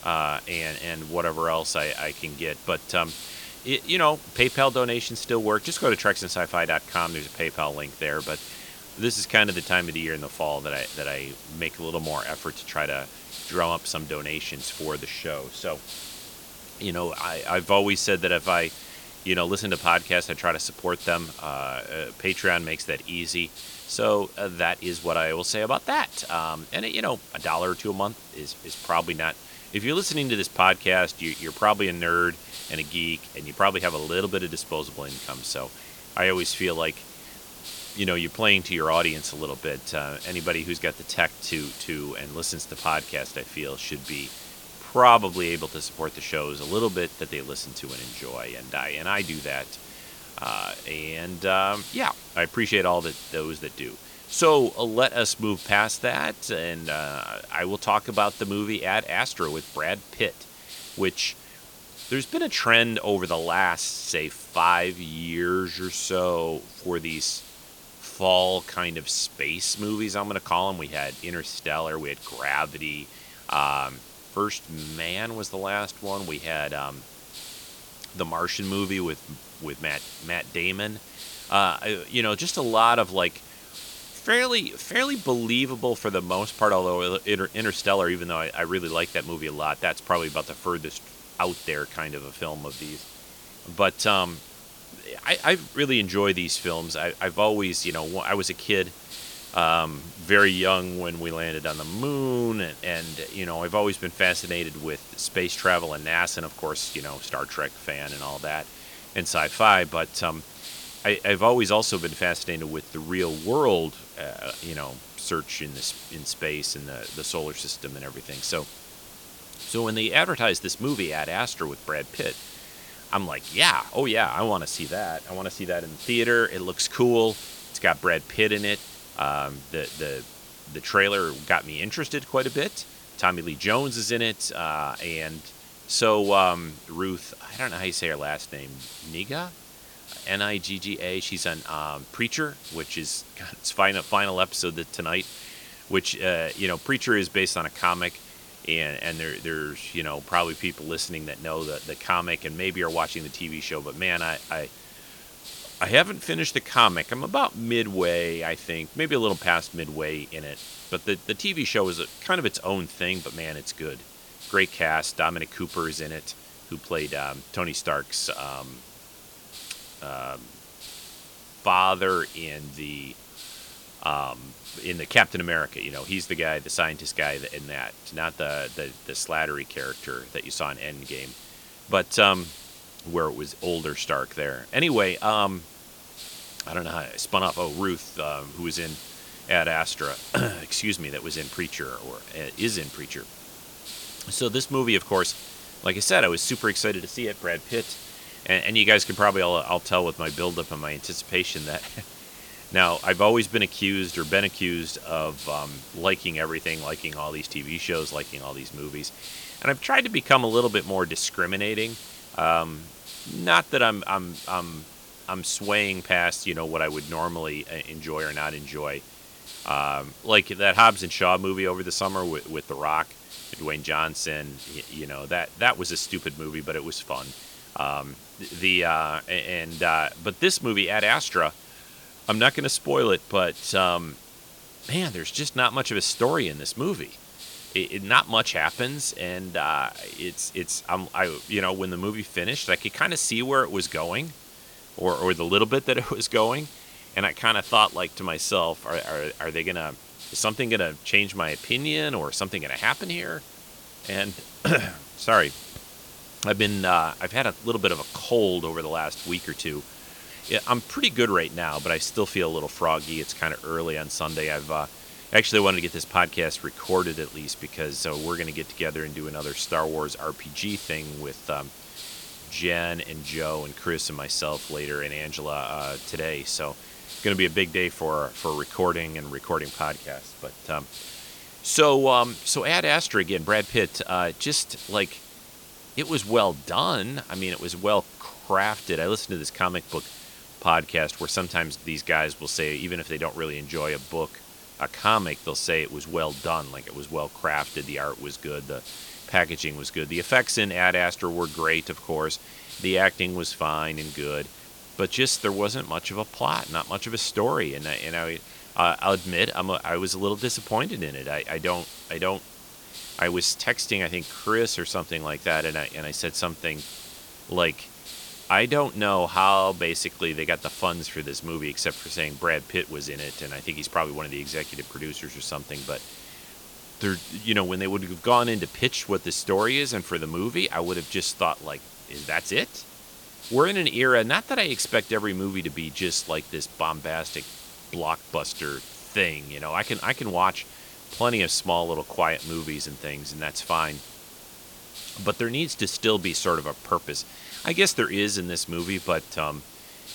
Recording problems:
hiss; noticeable; throughout; 15 dB below the speech

